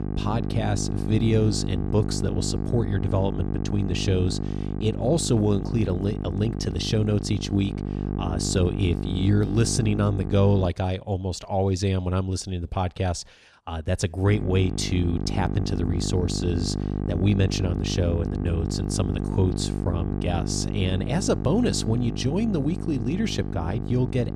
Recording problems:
electrical hum; loud; until 11 s and from 14 s on; 50 Hz, 6 dB below the speech

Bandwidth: 14.5 kHz